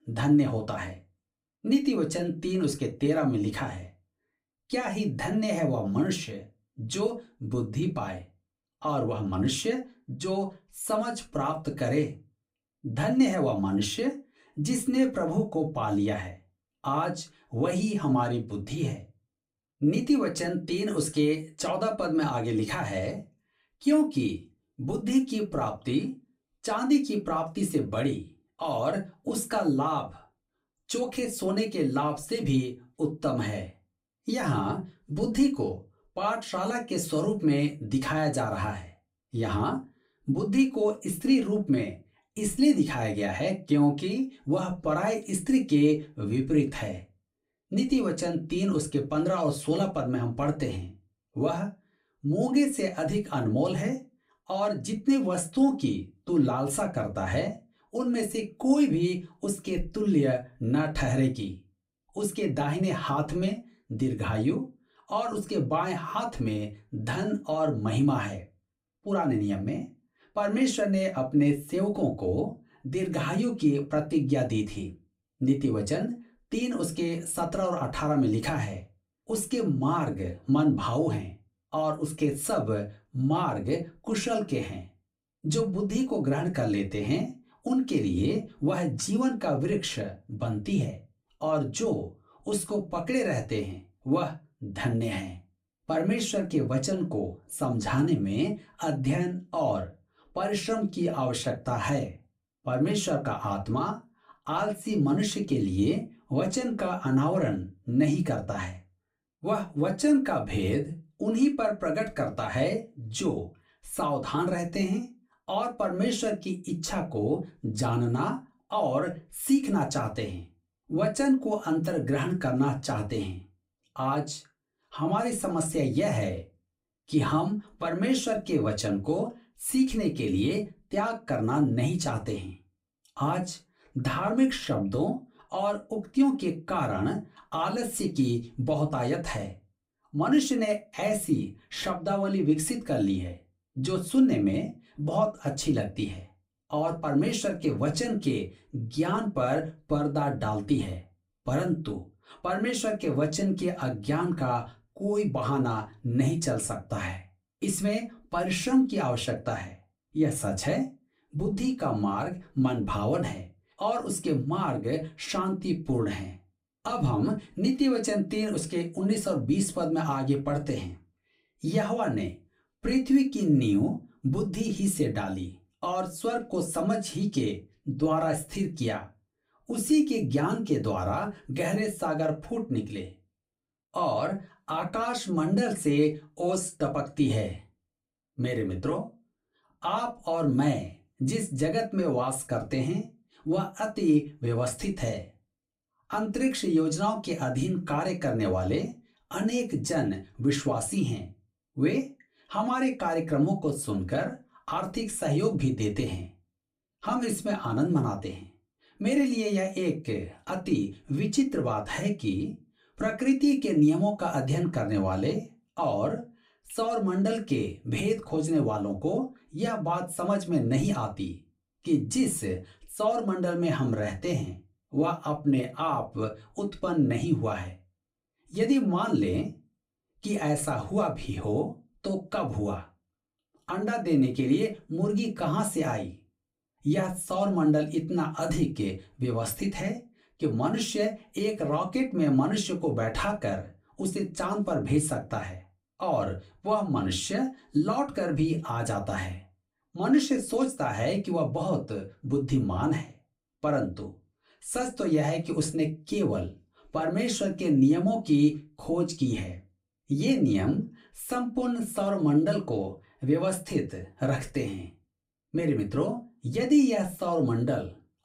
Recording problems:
off-mic speech; far
room echo; very slight; dies away in 0.2 s

